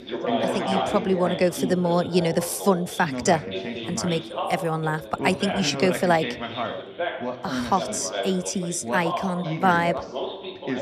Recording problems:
background chatter; loud; throughout; 3 voices, 5 dB below the speech

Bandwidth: 14.5 kHz